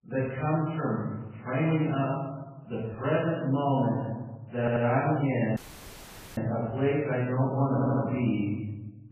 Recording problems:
room echo; strong; dies away in 1.1 s
off-mic speech; far
garbled, watery; badly; nothing above 3 kHz
audio stuttering; at 4.5 s and at 7.5 s
audio cutting out; at 5.5 s for 1 s

